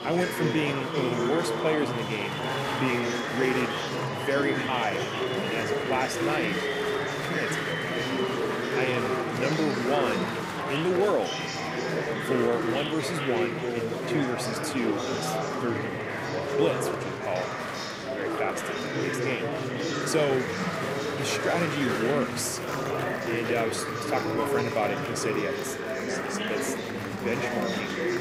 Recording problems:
murmuring crowd; very loud; throughout; 1 dB above the speech

